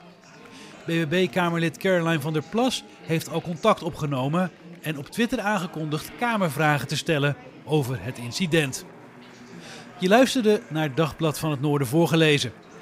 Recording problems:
chatter from many people; faint; throughout; 20 dB below the speech

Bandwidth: 15.5 kHz